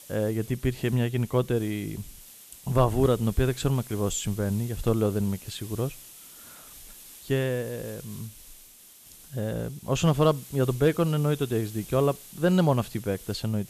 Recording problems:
hiss; noticeable; throughout; 20 dB below the speech

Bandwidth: 14 kHz